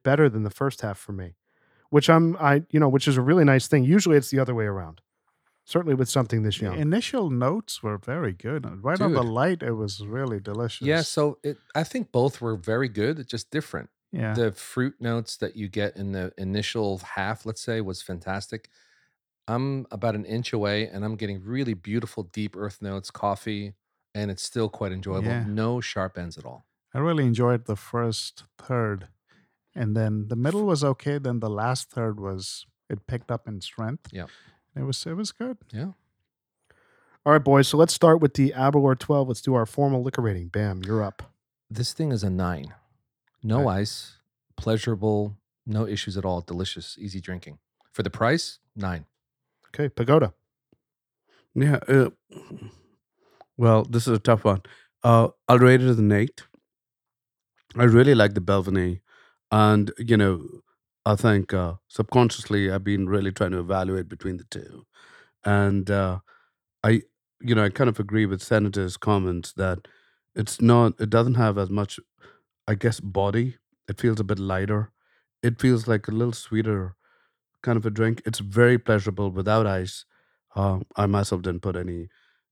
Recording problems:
none

